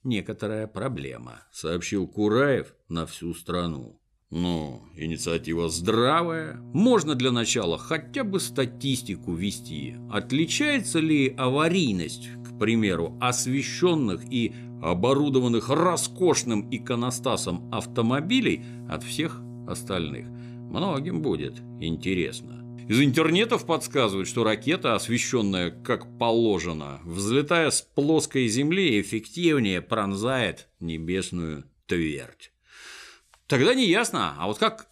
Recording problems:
electrical hum; faint; from 5 to 26 s; 60 Hz, 20 dB below the speech

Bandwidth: 15 kHz